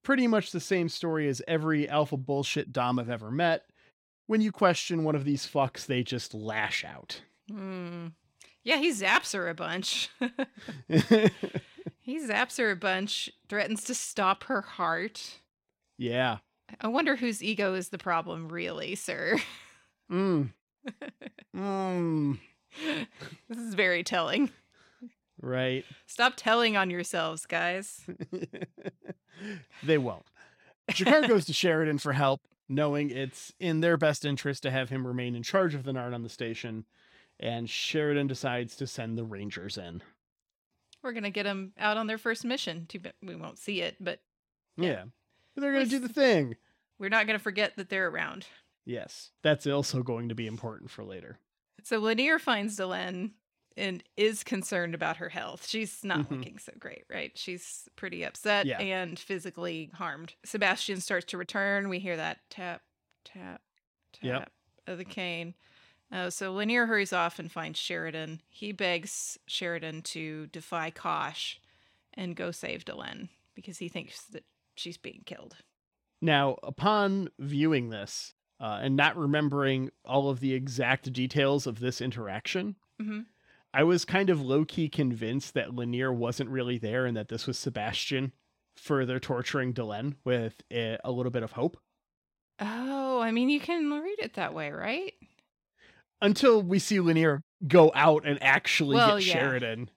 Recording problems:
none

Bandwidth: 16.5 kHz